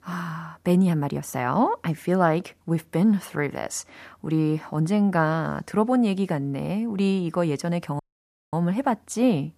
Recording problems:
audio cutting out; at 8 s for 0.5 s

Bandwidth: 14.5 kHz